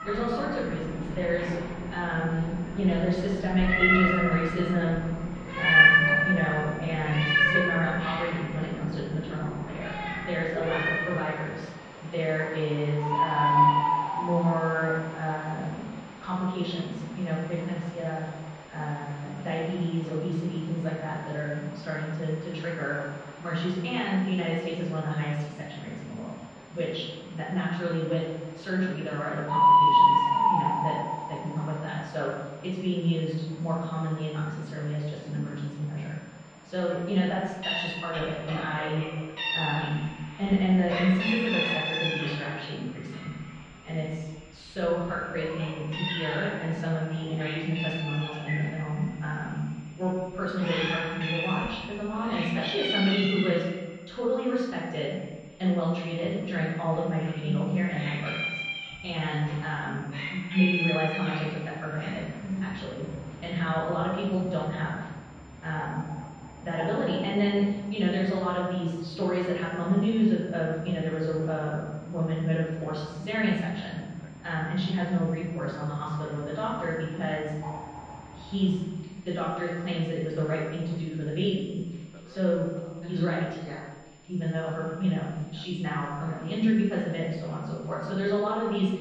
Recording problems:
off-mic speech; far
room echo; noticeable; dies away in 1 s
muffled; slightly; fading above 4 kHz
animal sounds; very loud; throughout; 3 dB above the speech
high-pitched whine; faint; throughout; 7 kHz, 30 dB below the speech
voice in the background; faint; throughout; 30 dB below the speech

